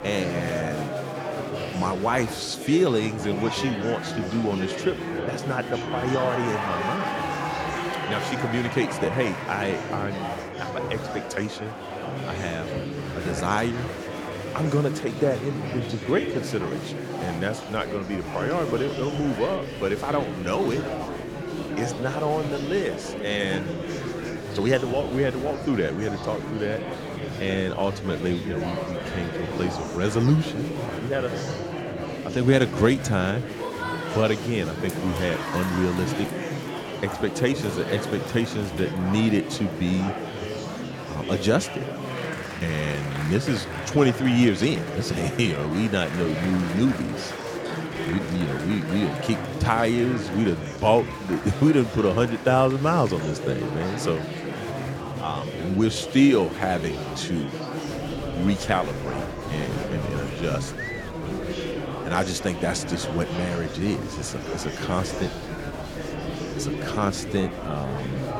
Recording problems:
murmuring crowd; loud; throughout; 5 dB below the speech

